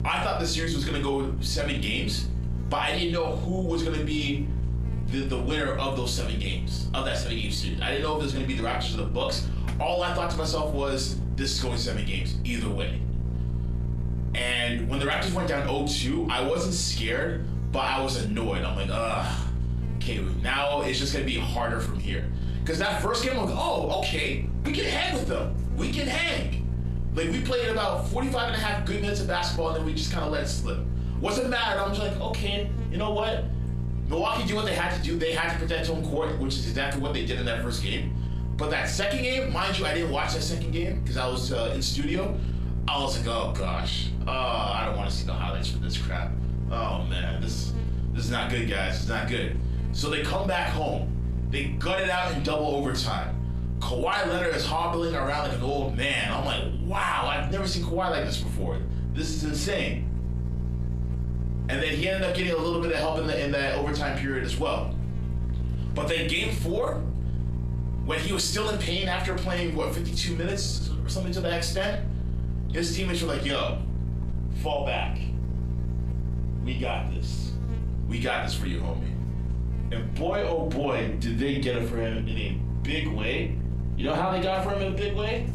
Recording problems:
off-mic speech; far
room echo; slight; dies away in 0.3 s
squashed, flat; somewhat
electrical hum; noticeable; throughout; 60 Hz, 15 dB below the speech

